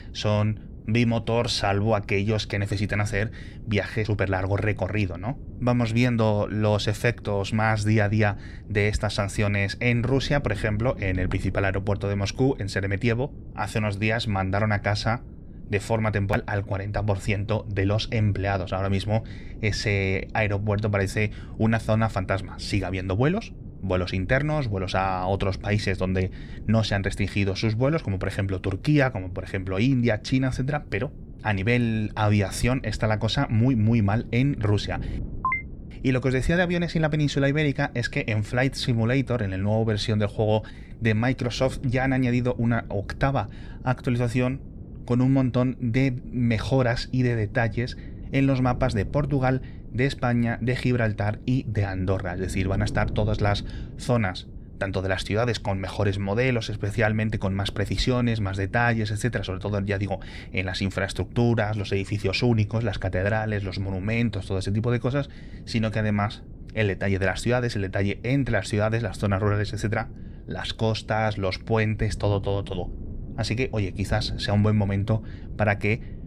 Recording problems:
wind noise on the microphone; occasional gusts; 20 dB below the speech

